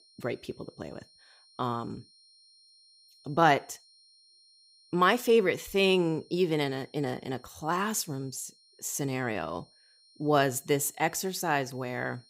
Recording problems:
high-pitched whine; faint; throughout; 4 kHz, 30 dB below the speech

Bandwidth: 15.5 kHz